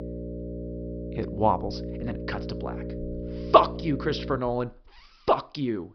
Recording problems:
high frequencies cut off; noticeable; nothing above 5.5 kHz
electrical hum; noticeable; until 4.5 s; 60 Hz, 15 dB below the speech

